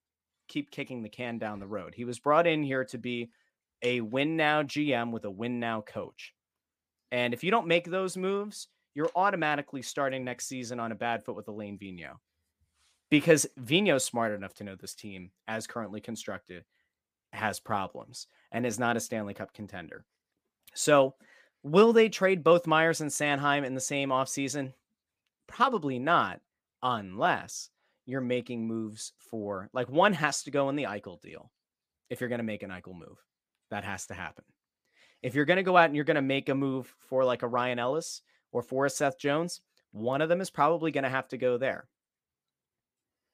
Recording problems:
none

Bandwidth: 15 kHz